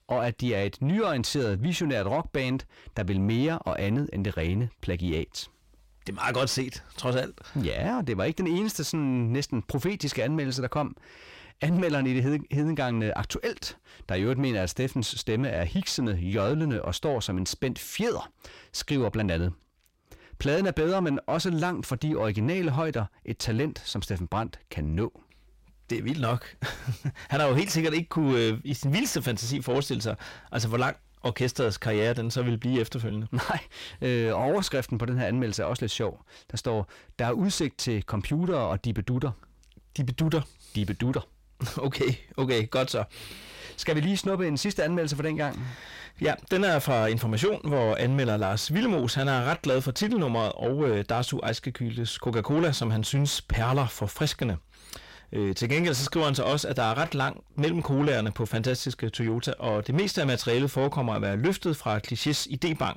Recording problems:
distortion; slight; 10 dB below the speech

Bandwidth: 16 kHz